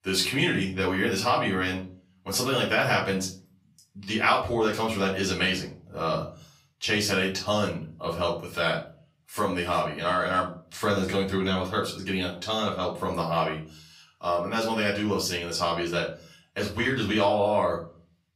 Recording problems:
off-mic speech; far
room echo; slight; dies away in 0.4 s

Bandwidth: 15.5 kHz